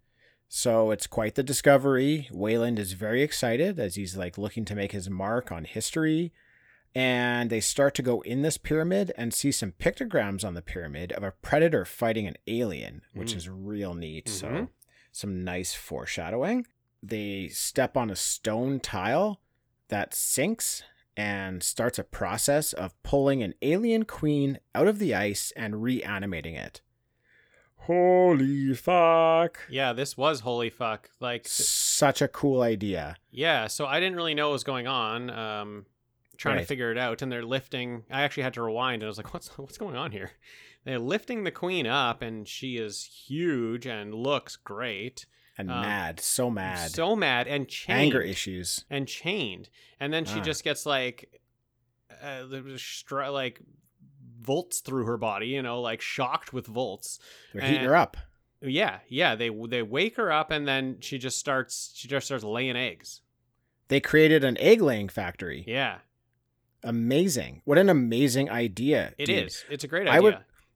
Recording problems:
none

